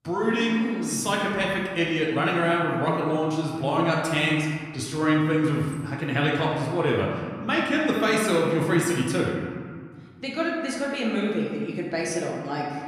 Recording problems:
off-mic speech; far
room echo; noticeable; dies away in 1.7 s

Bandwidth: 14.5 kHz